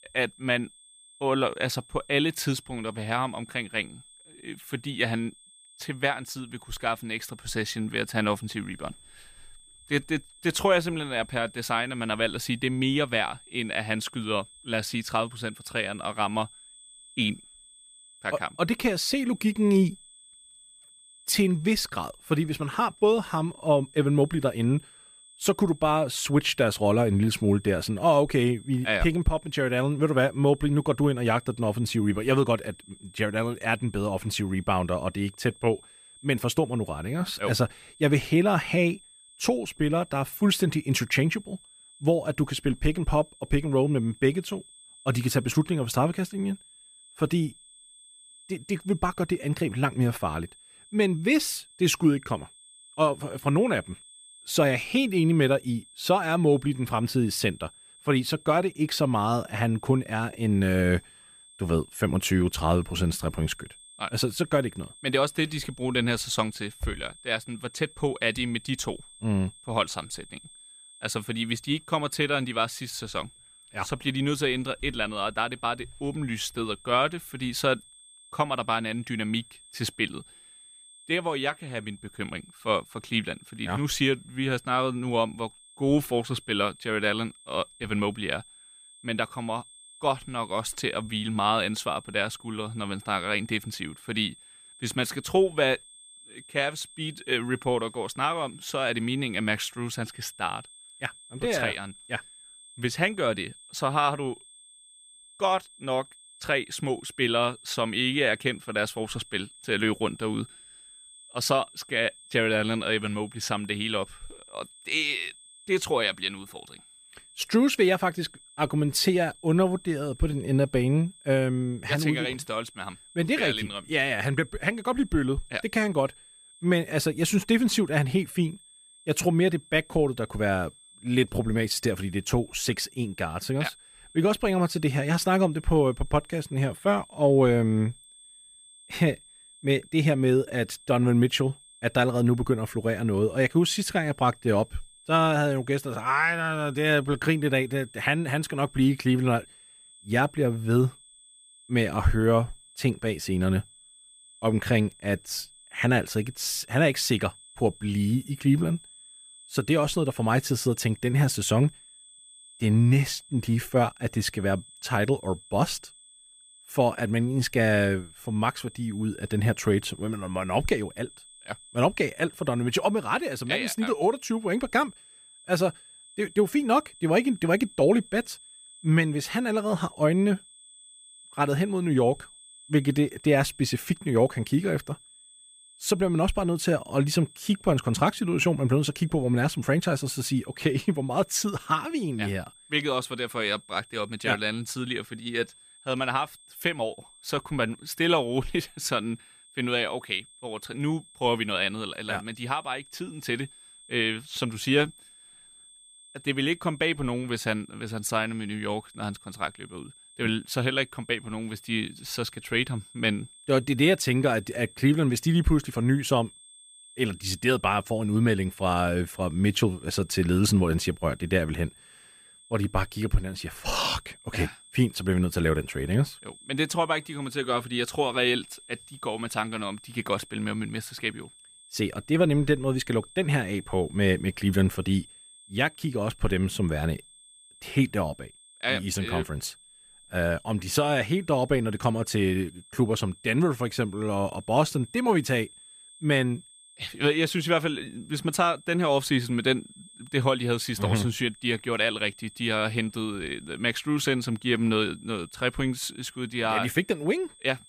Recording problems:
high-pitched whine; faint; throughout; 8.5 kHz, 25 dB below the speech

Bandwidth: 15 kHz